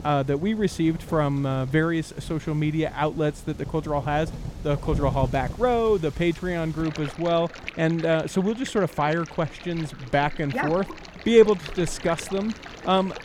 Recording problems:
rain or running water; noticeable; throughout; 15 dB below the speech

